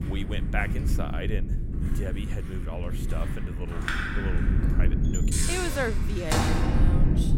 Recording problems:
household noises; very loud; throughout; 4 dB above the speech
low rumble; loud; throughout; 5 dB below the speech

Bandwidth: 16 kHz